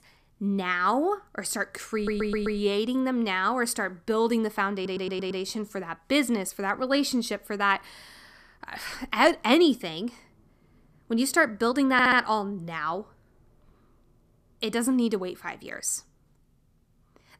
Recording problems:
audio stuttering; at 2 s, at 4.5 s and at 12 s

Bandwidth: 14.5 kHz